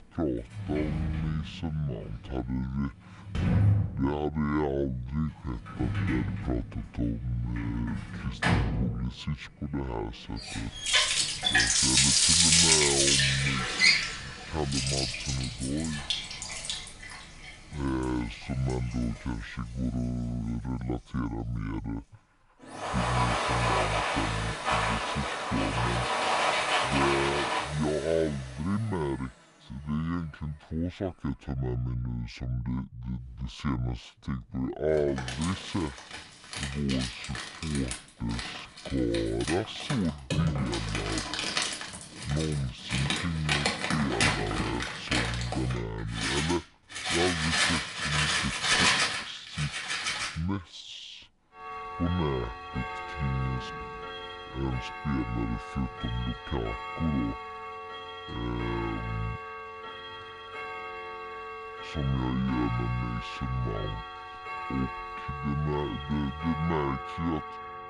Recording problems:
wrong speed and pitch; too slow and too low; 0.6 times normal speed
household noises; very loud; throughout; 4 dB above the speech

